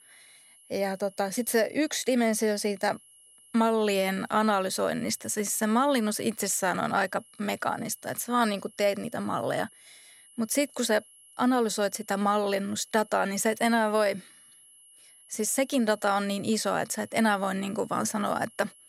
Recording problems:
high-pitched whine; faint; throughout; 11 kHz, 25 dB below the speech

